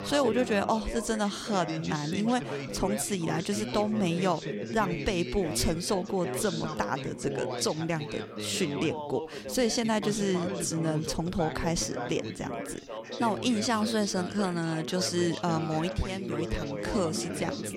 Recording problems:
background chatter; loud; throughout; 4 voices, 6 dB below the speech

